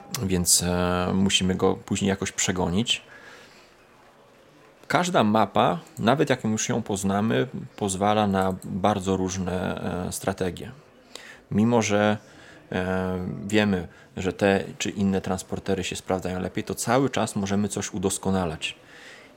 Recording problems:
murmuring crowd; faint; throughout; 30 dB below the speech

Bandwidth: 16 kHz